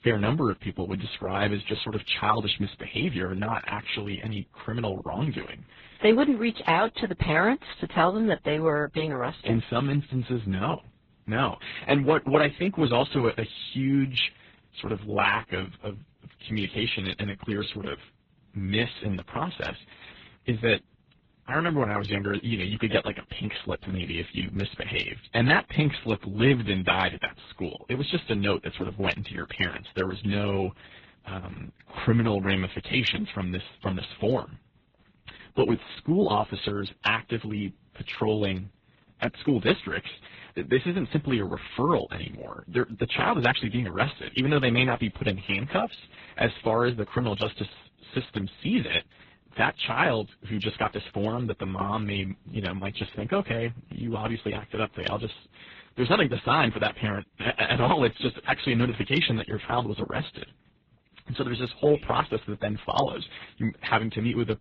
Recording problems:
garbled, watery; badly; nothing above 7.5 kHz

